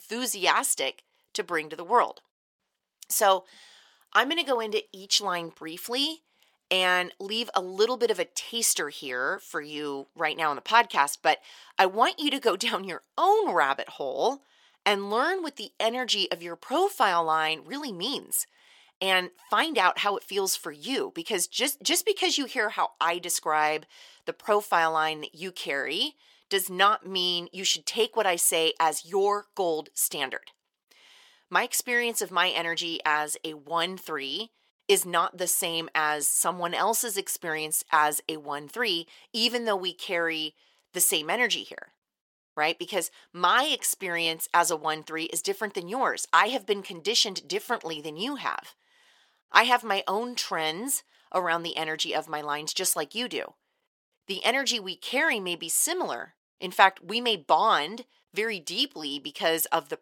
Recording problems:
thin; somewhat; fading below 450 Hz

